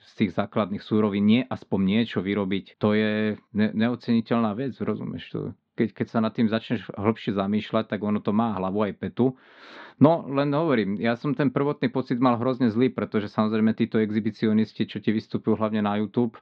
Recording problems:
muffled; slightly; fading above 4 kHz

